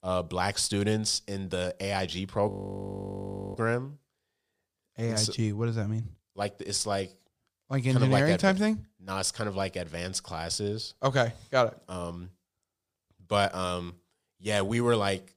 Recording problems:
audio freezing; at 2.5 s for 1 s

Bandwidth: 15 kHz